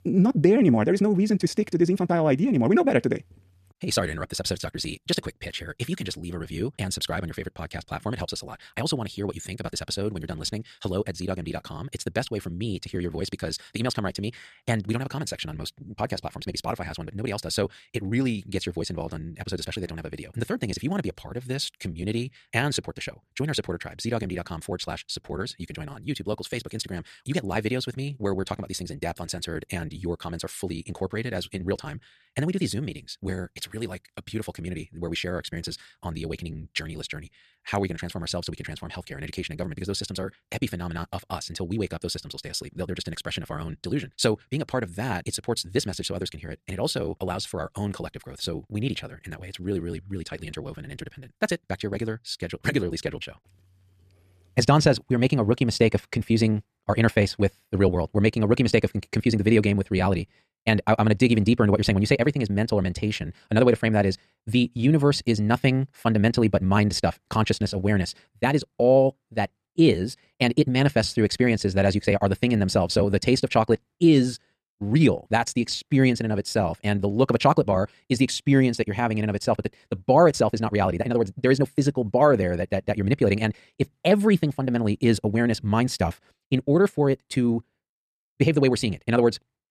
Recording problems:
wrong speed, natural pitch; too fast; 1.8 times normal speed

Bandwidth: 14 kHz